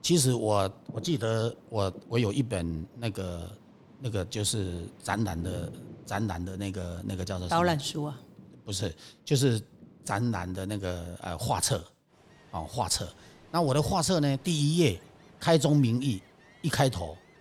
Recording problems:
rain or running water; faint; throughout; 20 dB below the speech

